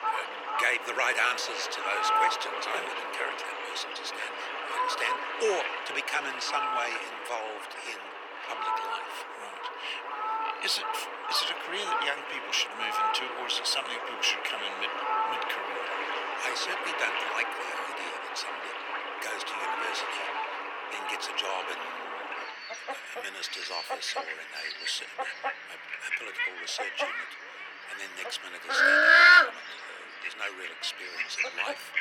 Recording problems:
thin; very; fading below 400 Hz
animal sounds; very loud; throughout; 4 dB above the speech

